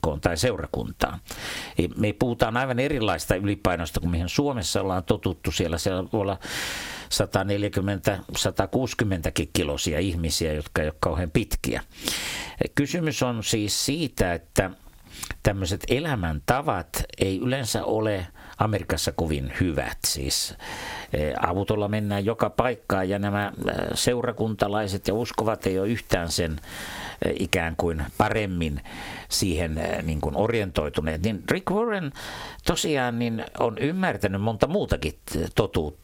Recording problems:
squashed, flat; heavily

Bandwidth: 16.5 kHz